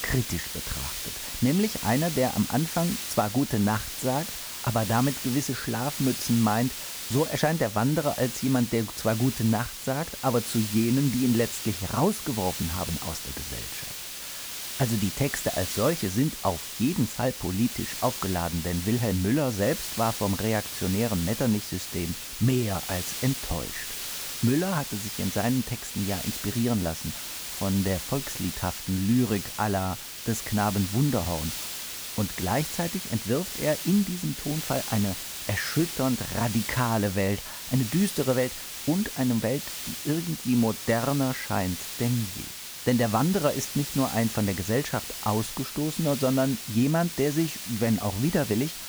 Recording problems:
hiss; loud; throughout; 6 dB below the speech

